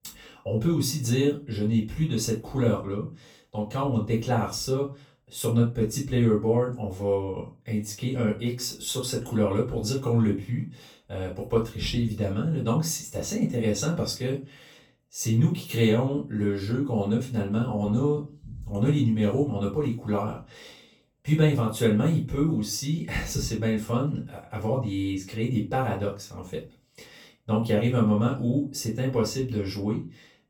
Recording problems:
off-mic speech; far
room echo; slight; dies away in 0.3 s

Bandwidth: 18.5 kHz